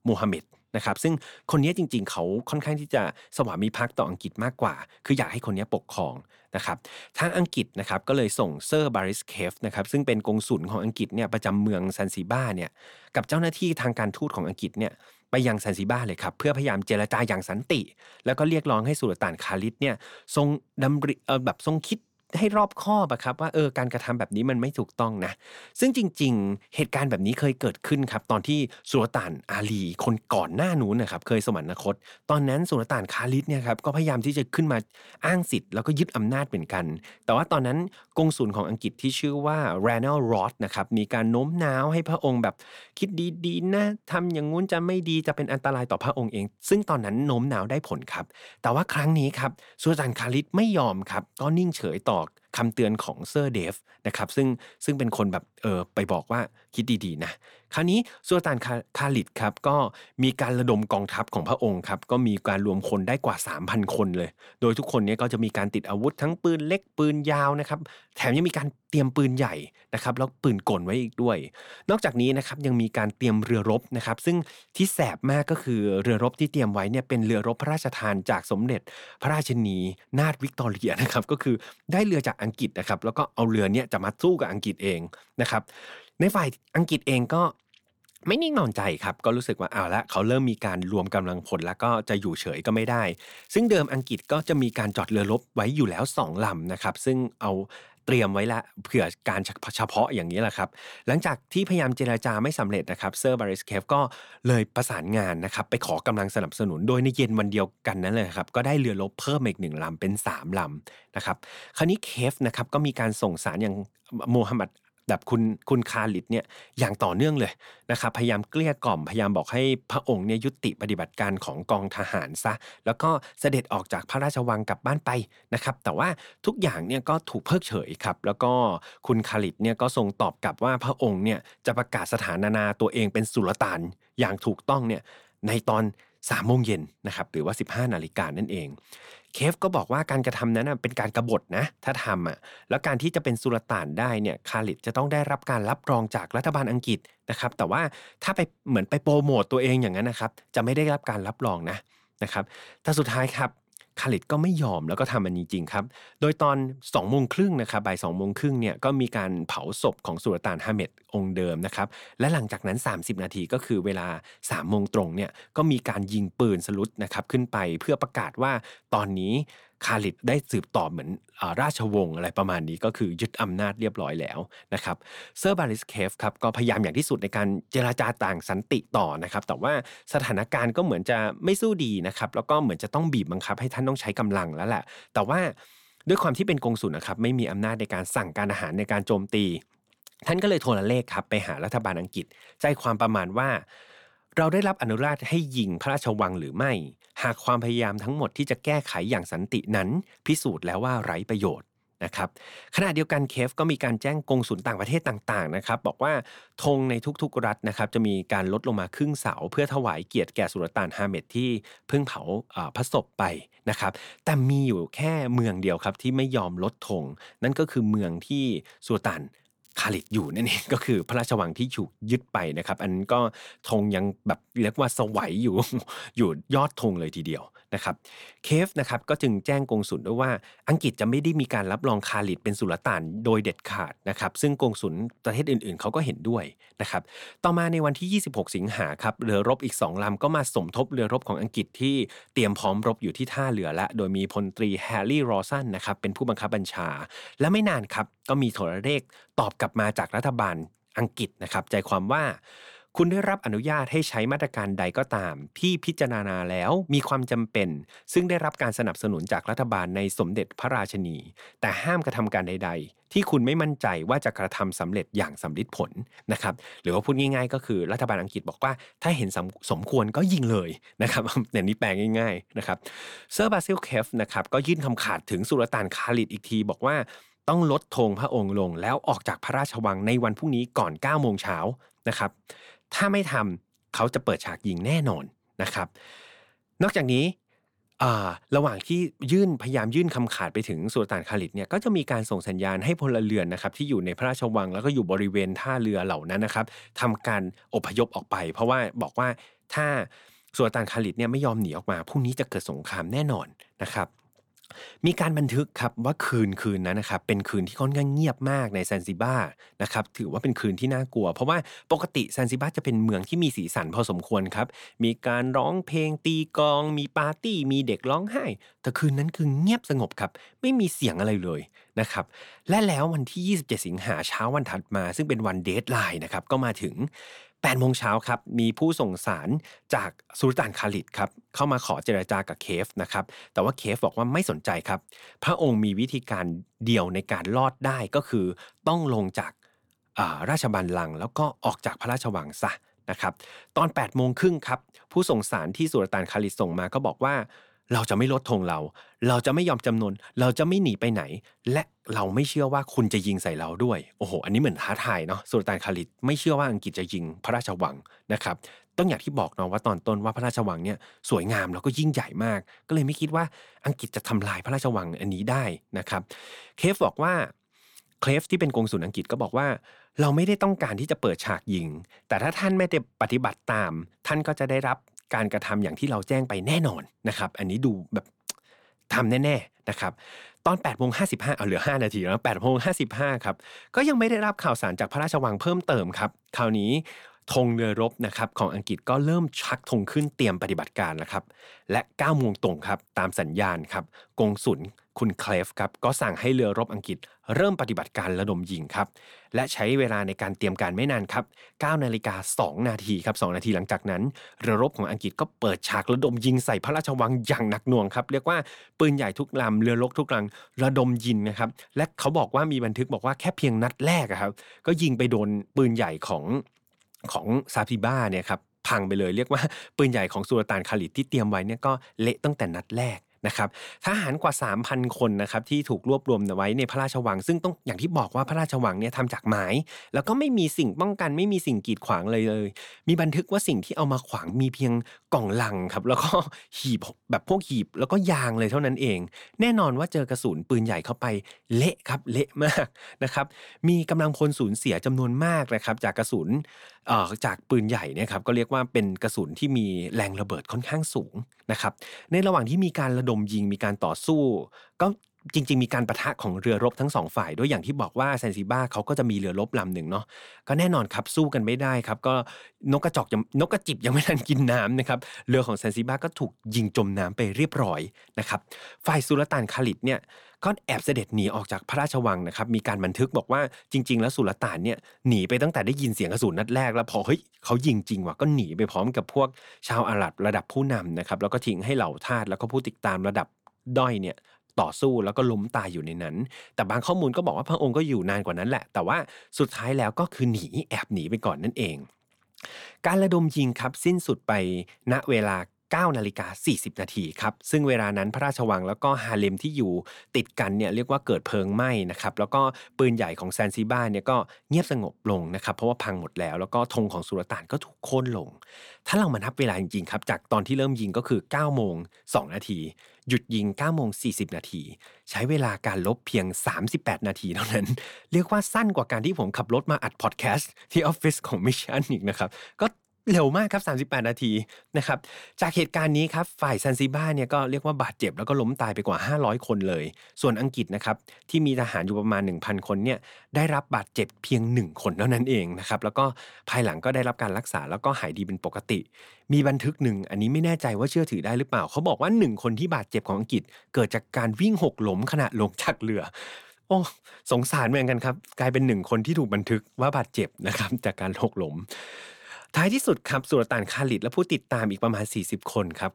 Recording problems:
crackling; faint; from 1:33 to 1:34, from 1:34 to 1:35 and from 3:40 to 3:41; 30 dB below the speech

